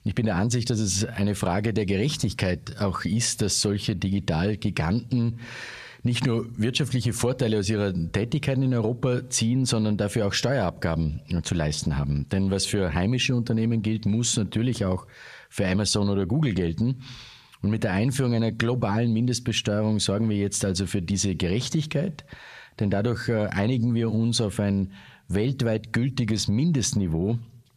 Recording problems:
squashed, flat; somewhat

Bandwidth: 14.5 kHz